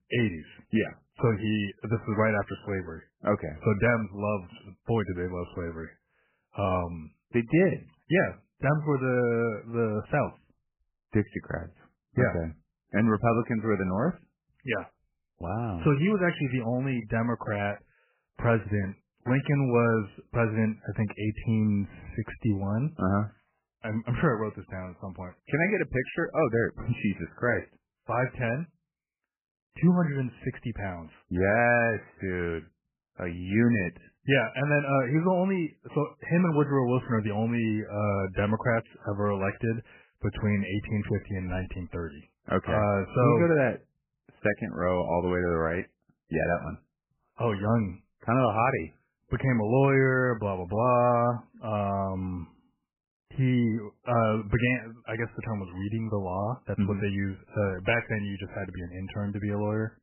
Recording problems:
garbled, watery; badly; nothing above 3 kHz

